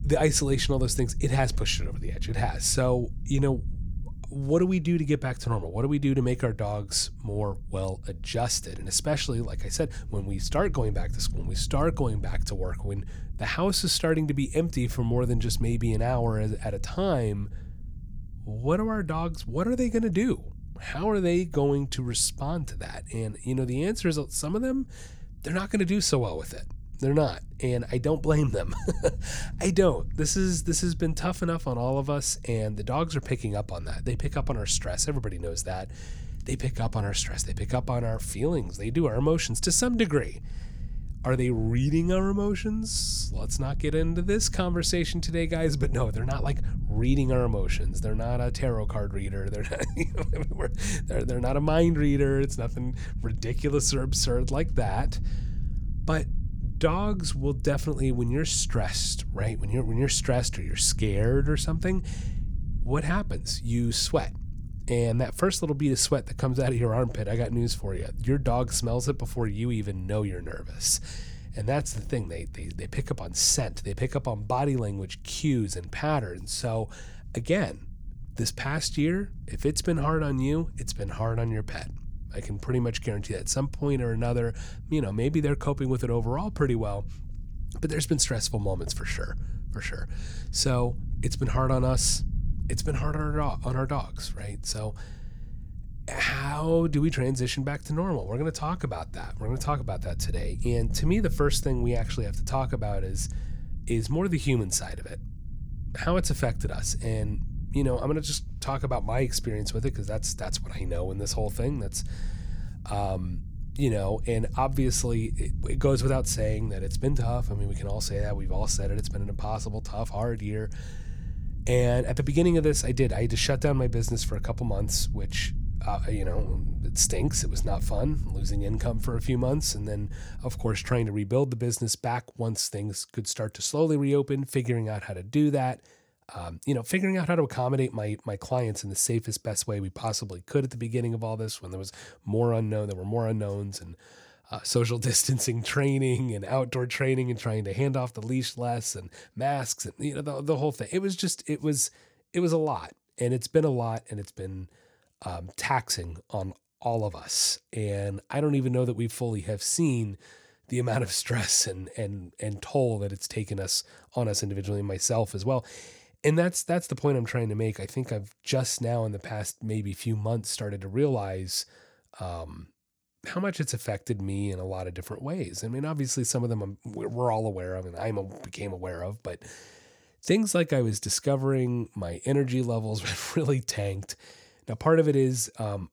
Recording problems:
low rumble; faint; until 2:11; 20 dB below the speech

